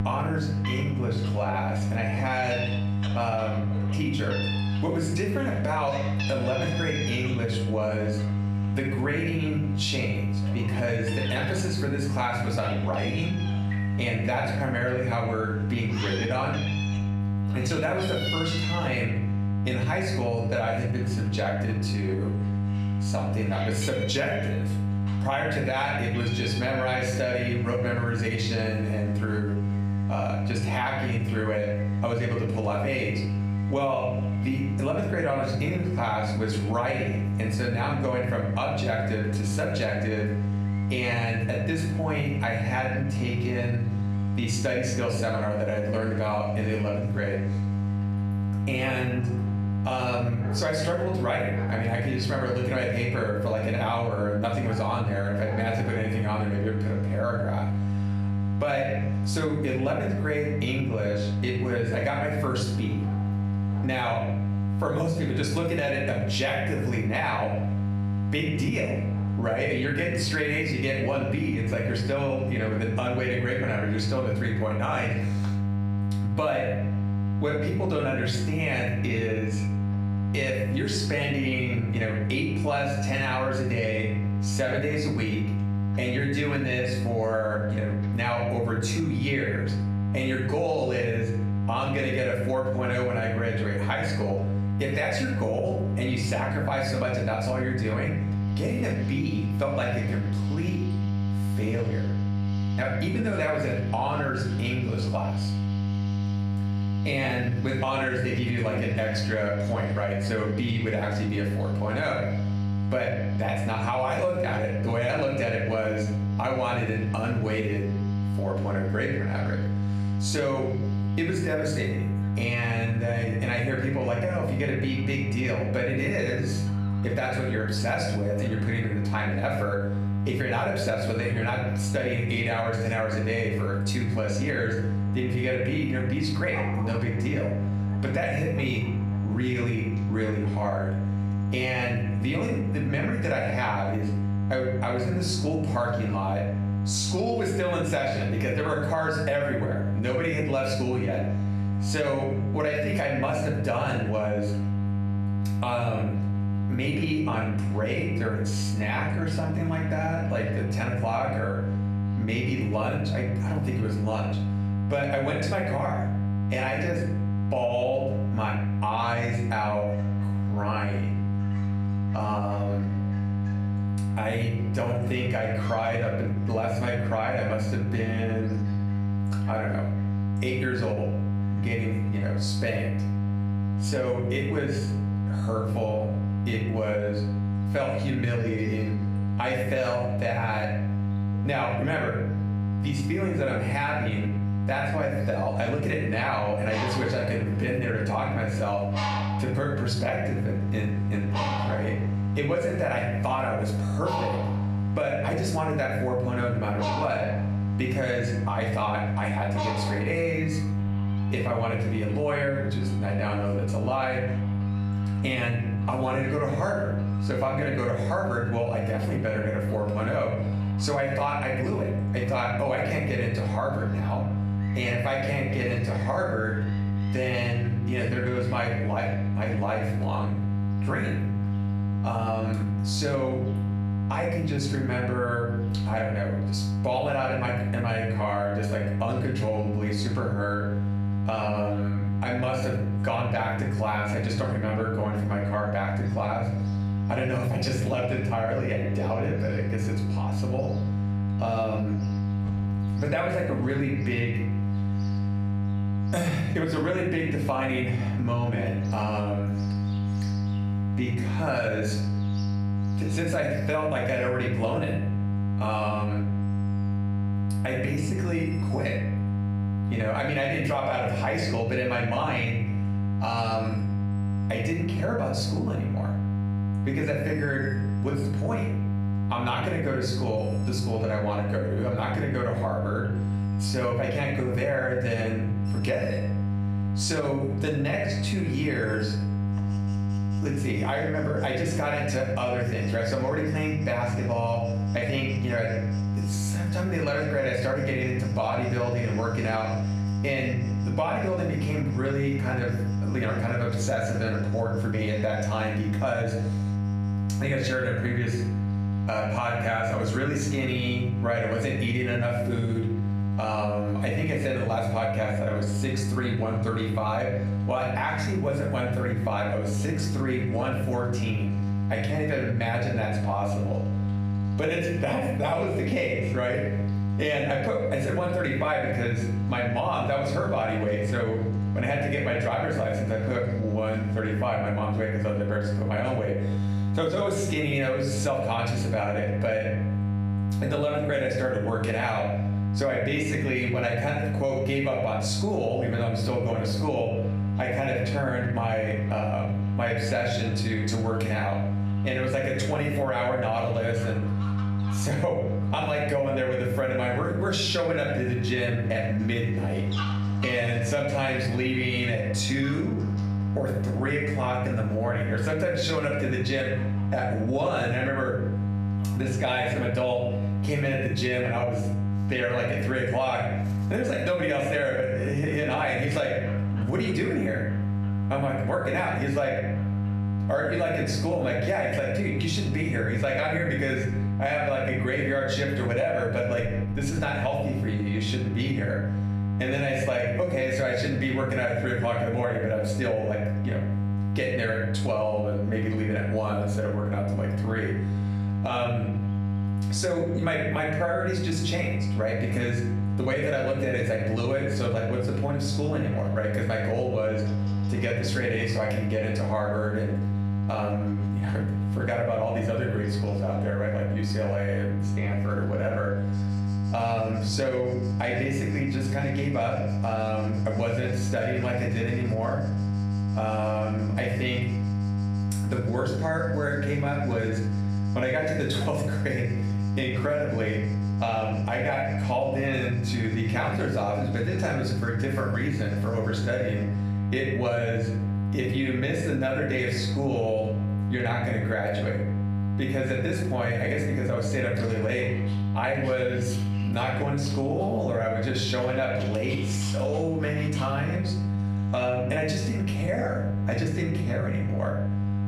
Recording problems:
off-mic speech; far
room echo; noticeable; dies away in 0.5 s
squashed, flat; somewhat
electrical hum; noticeable; throughout; 50 Hz, 10 dB below the speech
animal sounds; noticeable; throughout; 15 dB below the speech

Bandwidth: 14 kHz